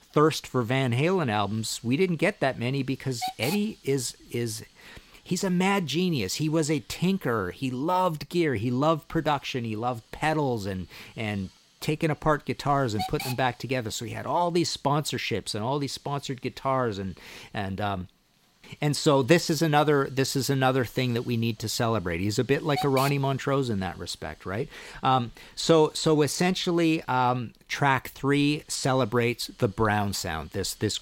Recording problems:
hiss; noticeable; throughout; 15 dB below the speech

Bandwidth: 16 kHz